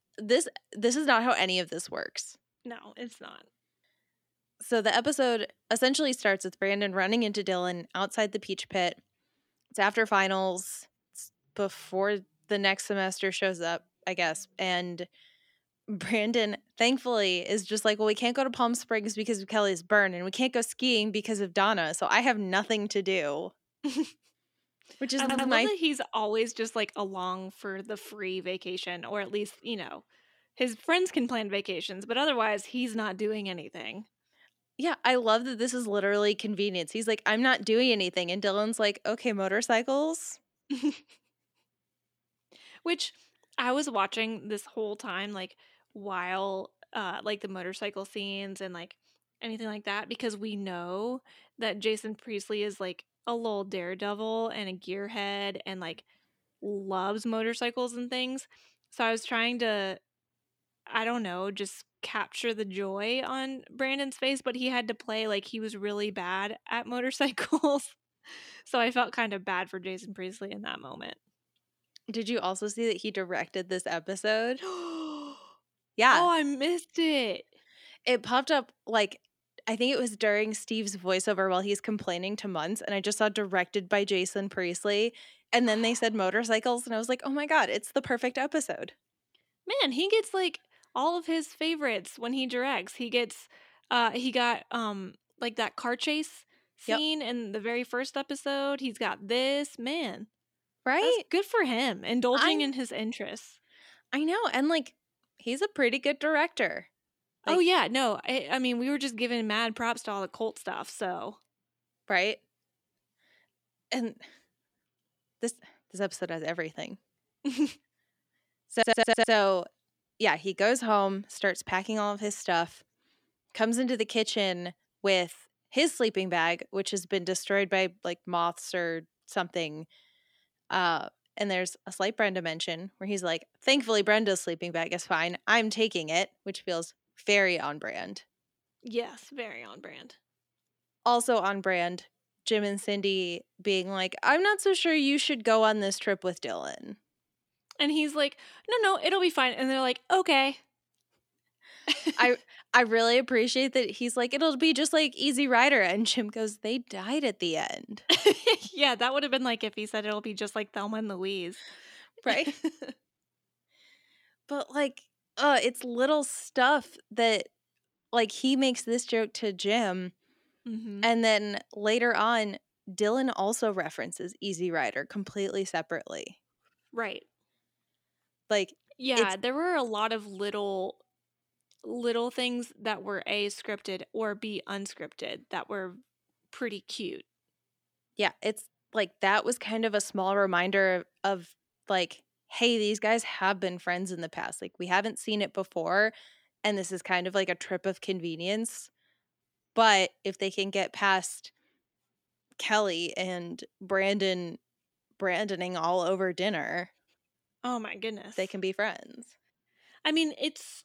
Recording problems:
audio stuttering; at 25 s and at 1:59

